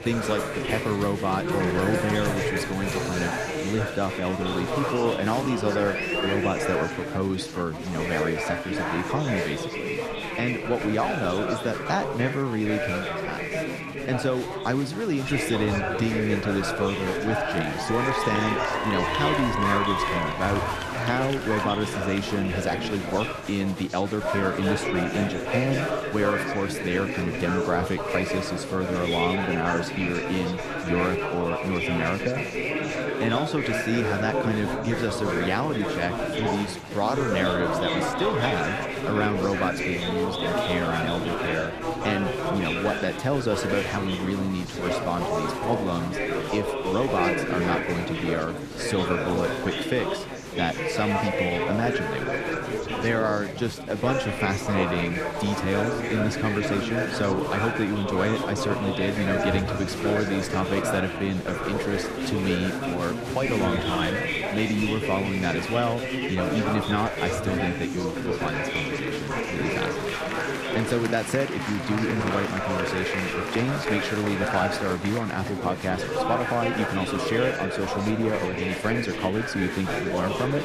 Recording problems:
chatter from many people; loud; throughout; as loud as the speech

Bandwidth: 14 kHz